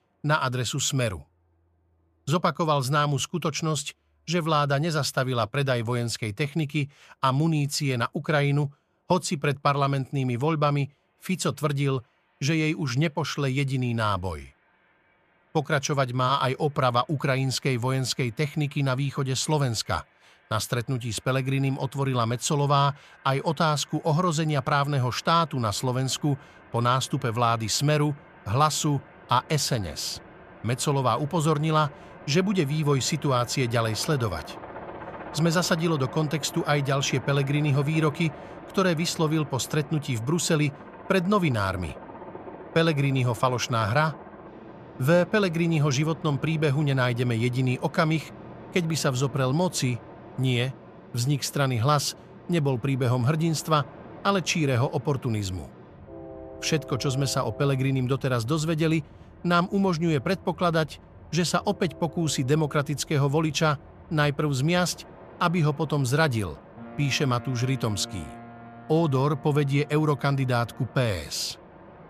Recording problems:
train or aircraft noise; noticeable; throughout; 20 dB below the speech

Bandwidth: 14.5 kHz